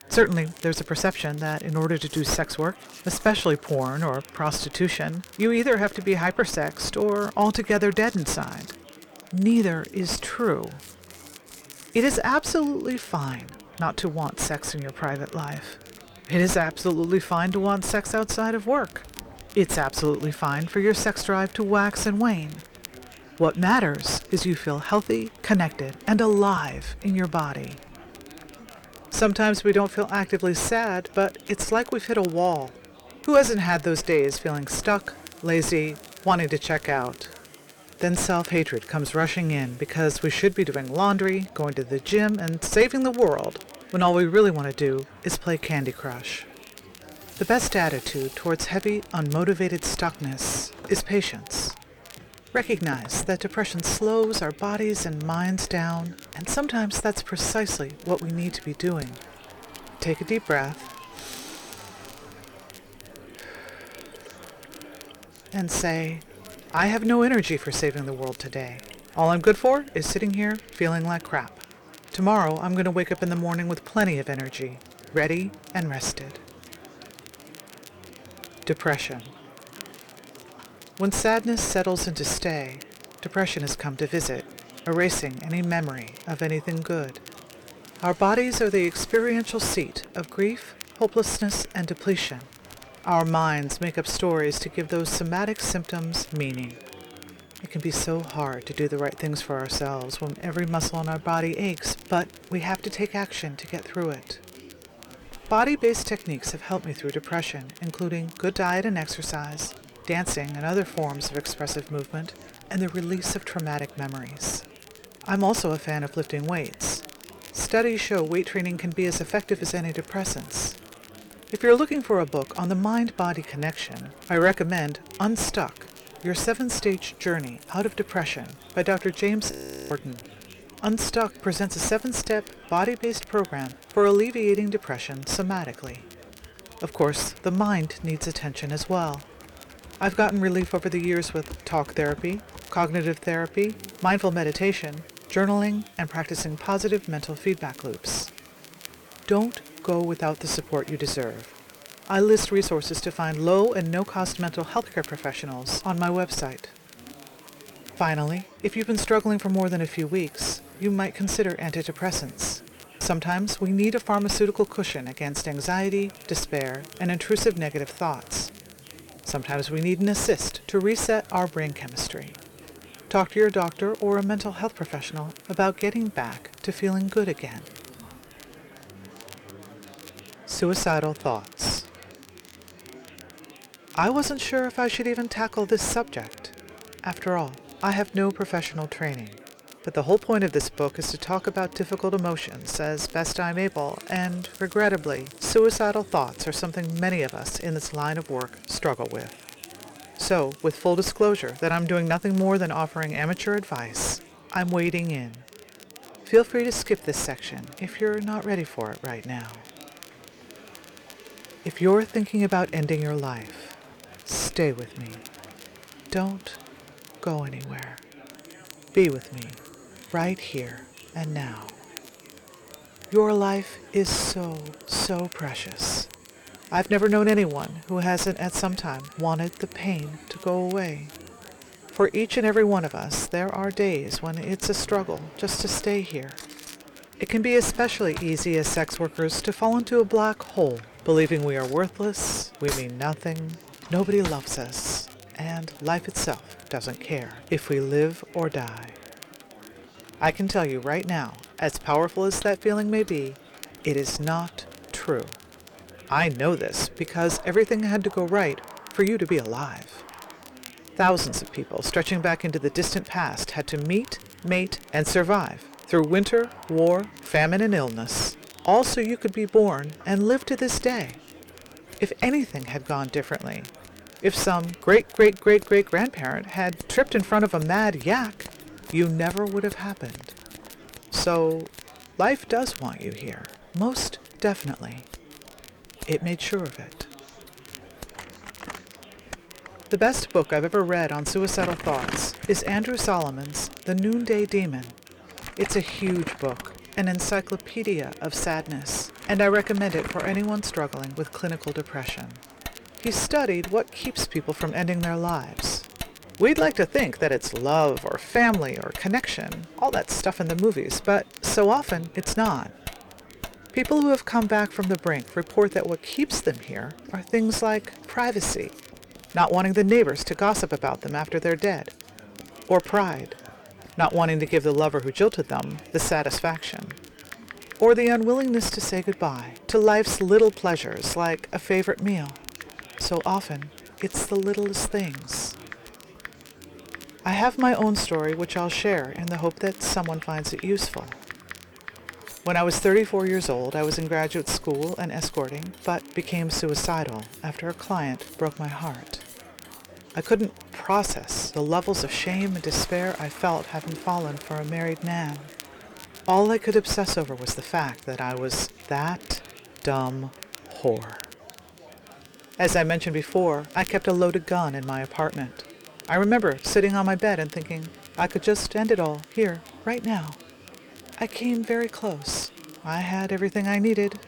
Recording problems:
distortion; slight; 7 dB below the speech
household noises; faint; throughout; 20 dB below the speech
murmuring crowd; faint; throughout; 25 dB below the speech
crackle, like an old record; faint; 25 dB below the speech
audio freezing; at 2:10

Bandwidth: 18.5 kHz